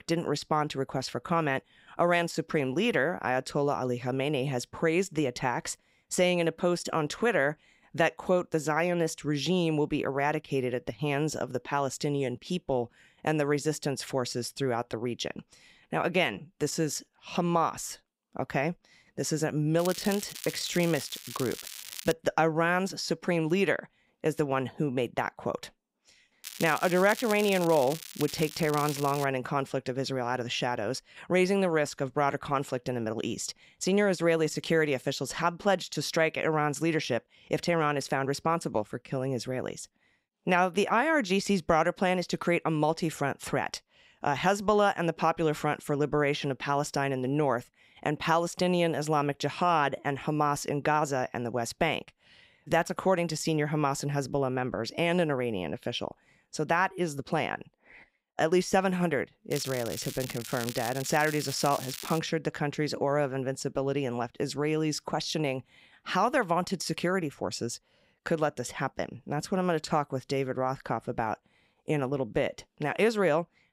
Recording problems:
crackling; noticeable; from 20 to 22 s, from 26 to 29 s and from 1:00 to 1:02; 10 dB below the speech

